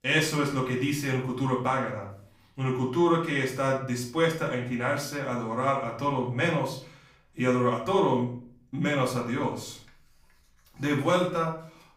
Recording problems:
off-mic speech; far
room echo; slight; dies away in 0.4 s

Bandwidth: 15.5 kHz